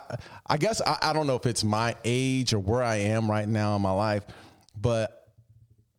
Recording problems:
squashed, flat; somewhat

